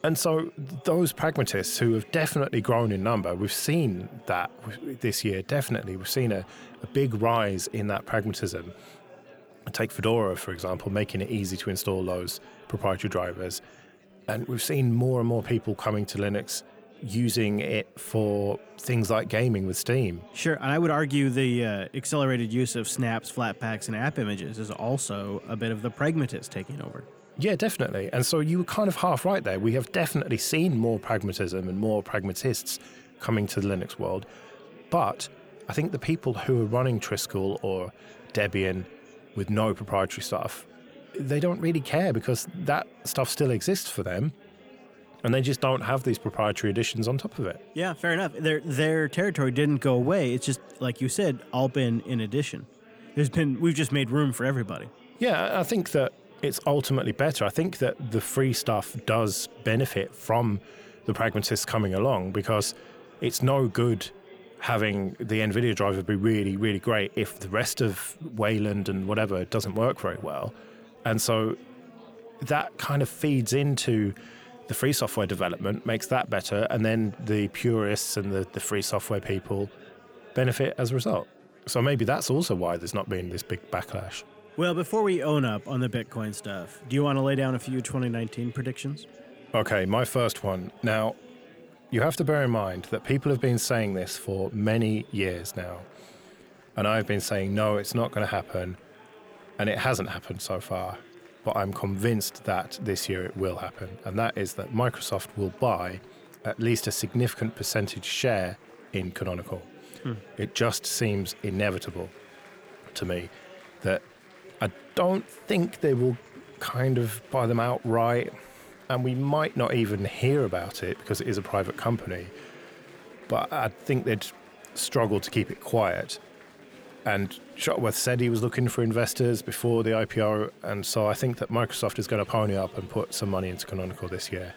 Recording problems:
murmuring crowd; faint; throughout; 20 dB below the speech

